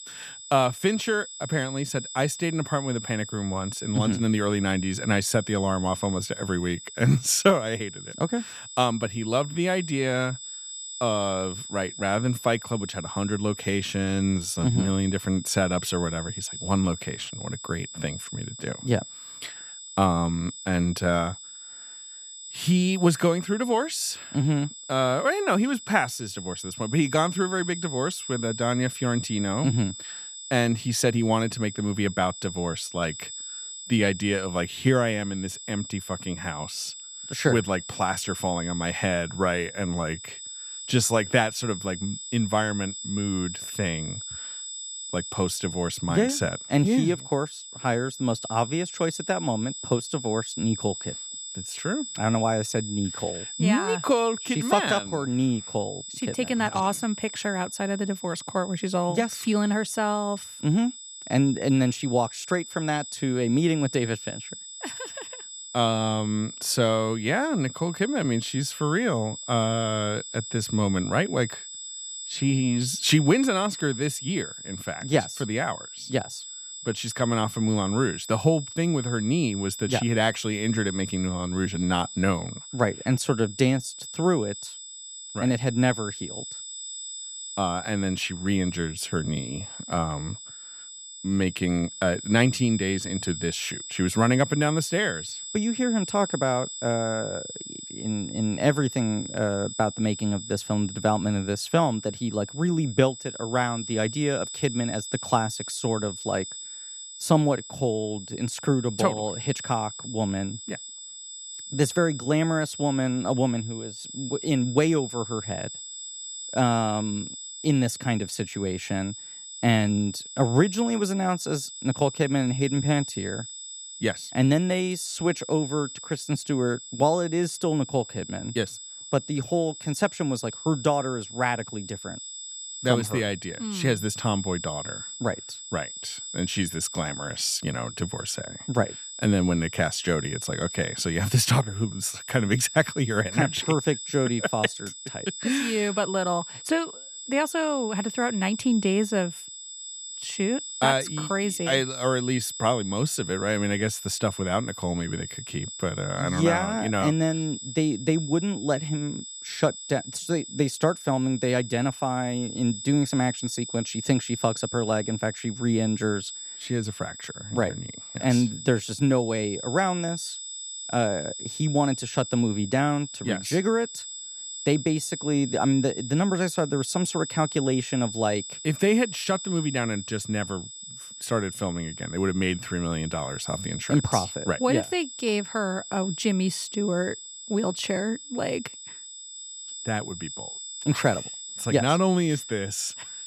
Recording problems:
high-pitched whine; loud; throughout; 7.5 kHz, 10 dB below the speech

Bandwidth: 14.5 kHz